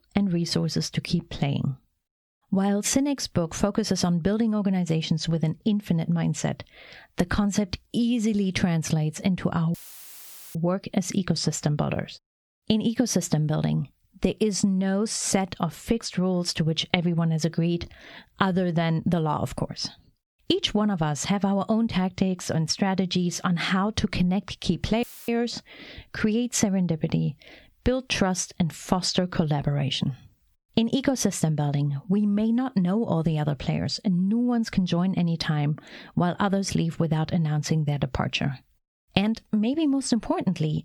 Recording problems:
squashed, flat; heavily
audio cutting out; filled with static; at 9.5 s for 1 s and at 25 s

